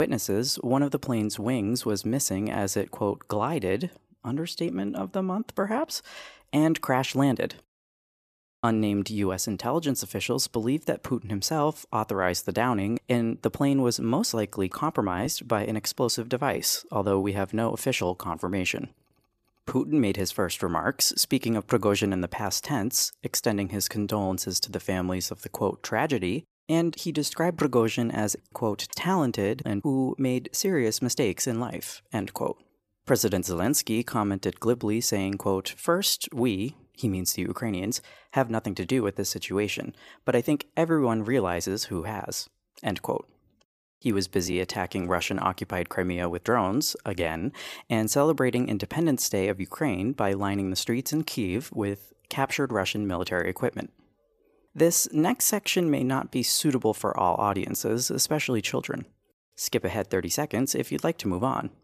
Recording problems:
abrupt cut into speech; at the start

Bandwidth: 14.5 kHz